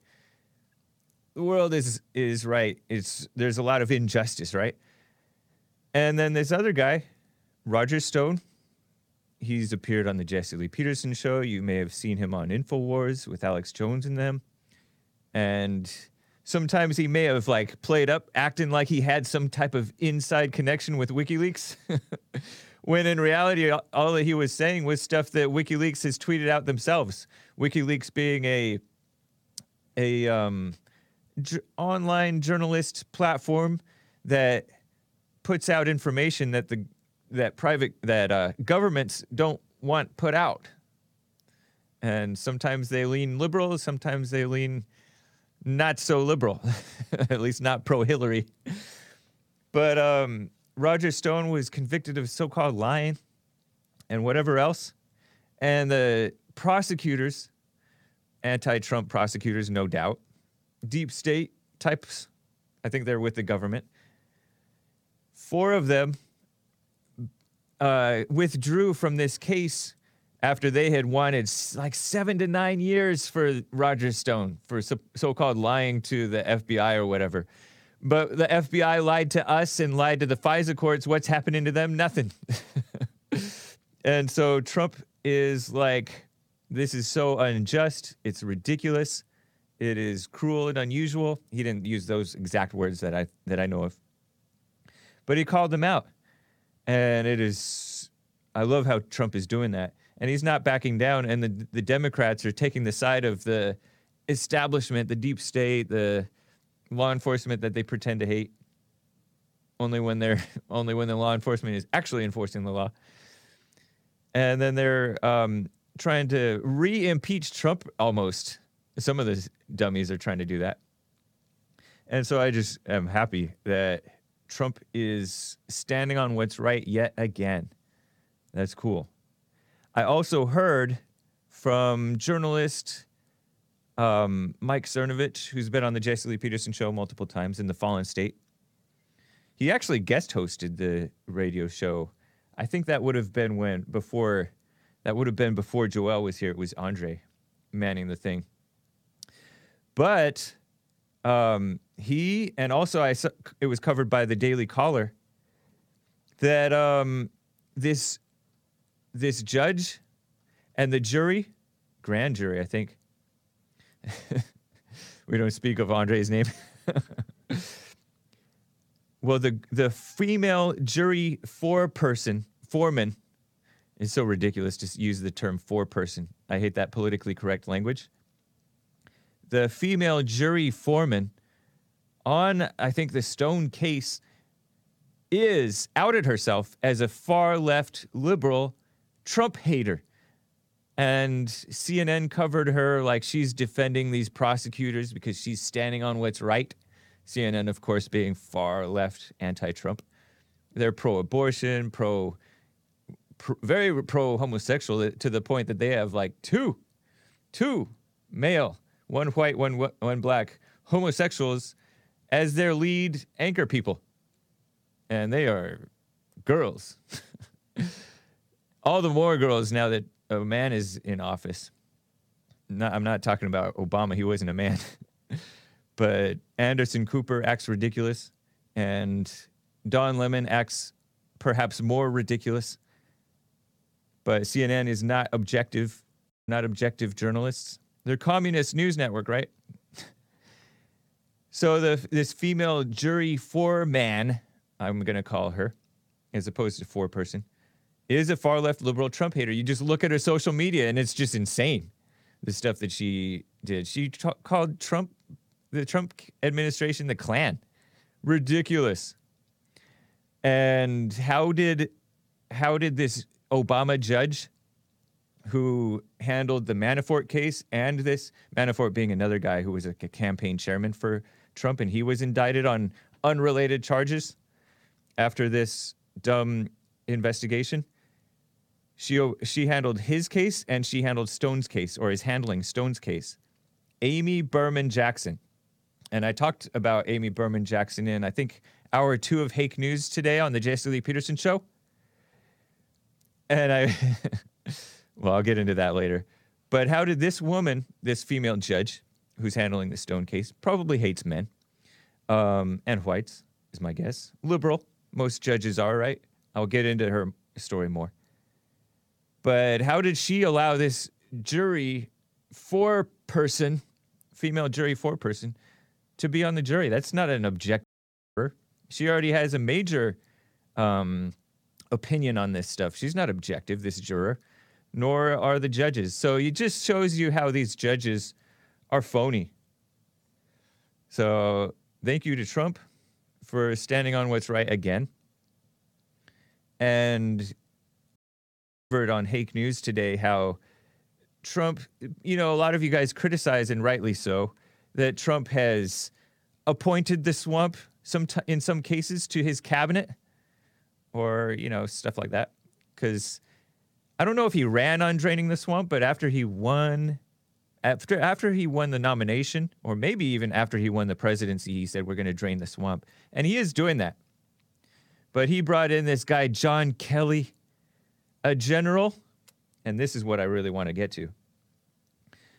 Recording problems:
audio cutting out; at 3:56, at 5:18 for 0.5 s and at 5:38 for 1 s

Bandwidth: 18 kHz